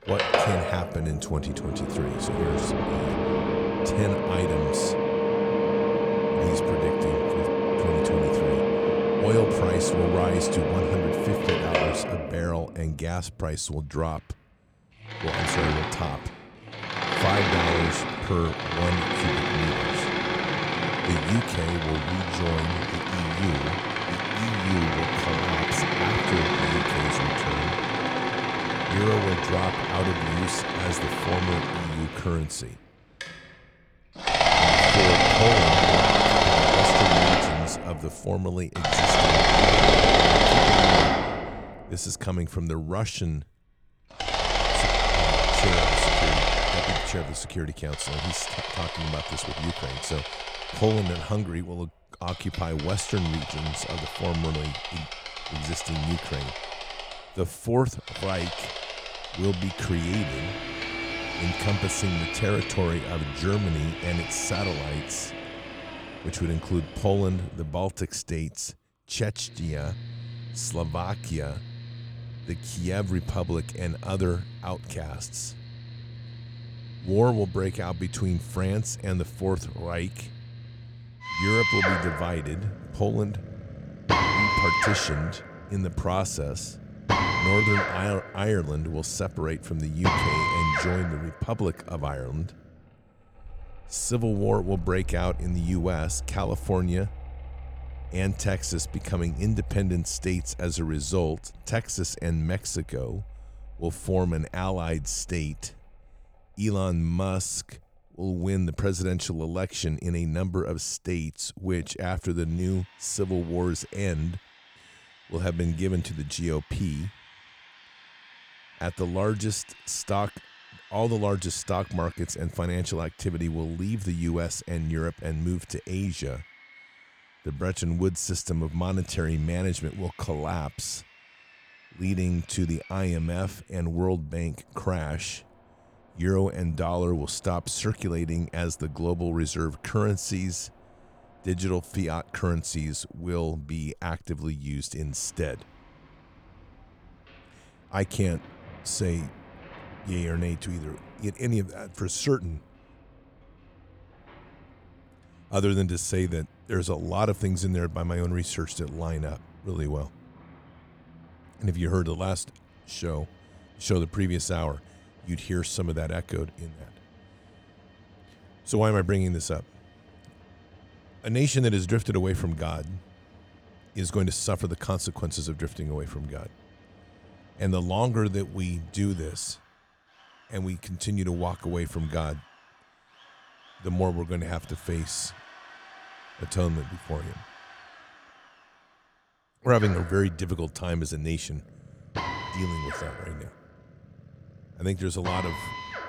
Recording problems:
machinery noise; very loud; throughout; 4 dB above the speech

